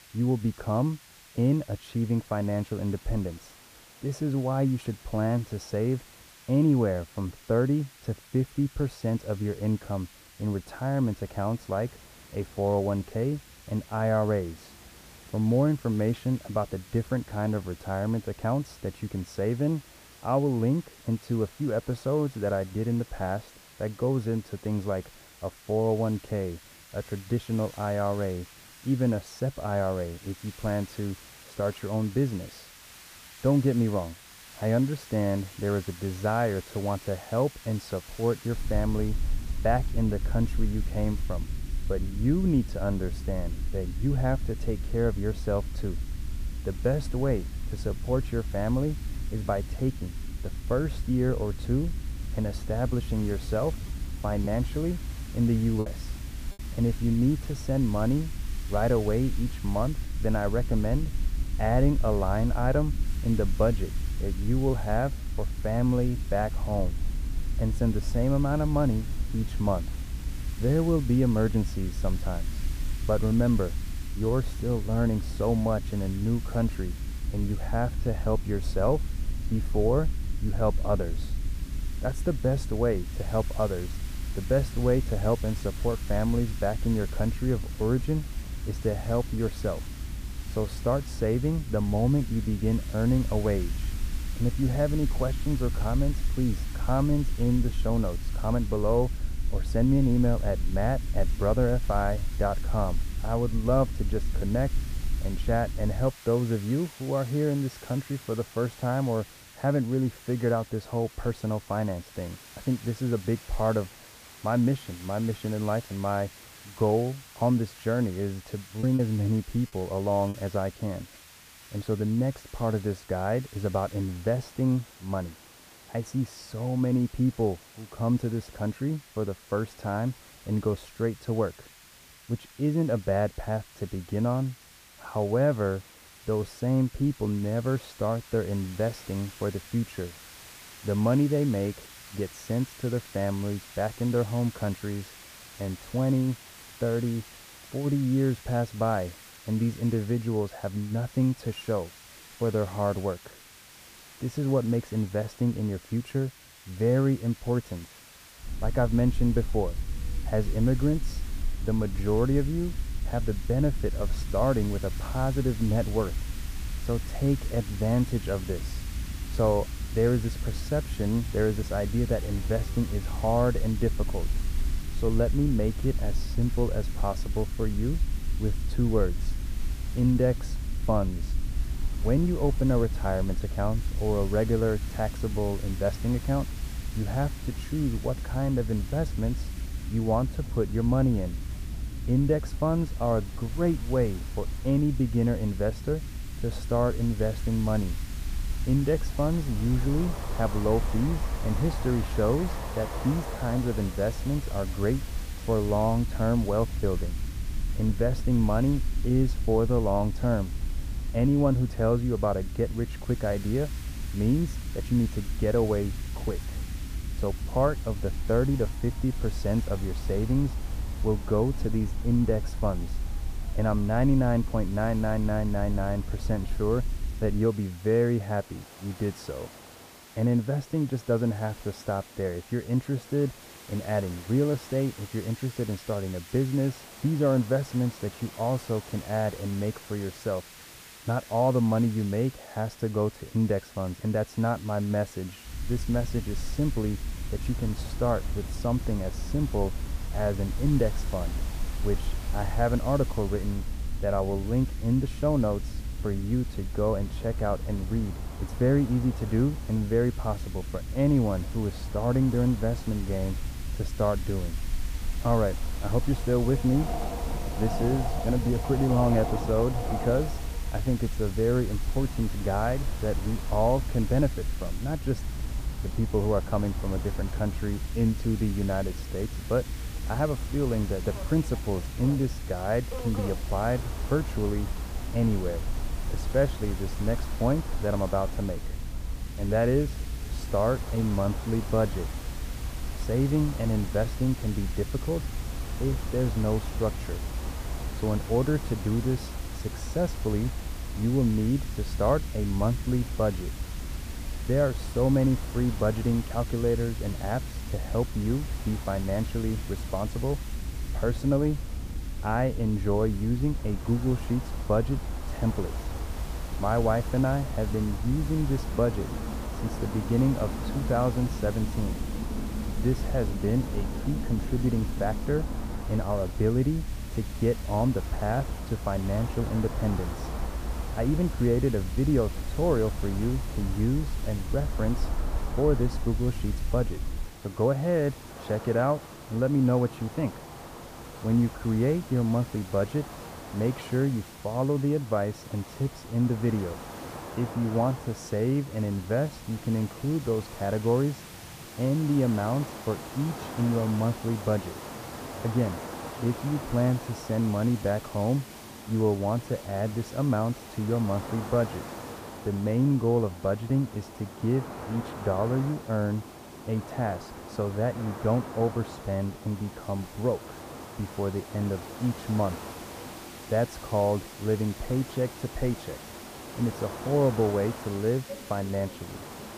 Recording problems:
muffled; very; fading above 1.5 kHz
train or aircraft noise; noticeable; throughout; 15 dB below the speech
hiss; noticeable; throughout; 20 dB below the speech
low rumble; faint; from 39 s to 1:46, from 2:38 to 3:47 and from 4:06 to 5:37; 20 dB below the speech
choppy; occasionally; from 54 to 56 s and from 1:59 to 2:00; 3% of the speech affected

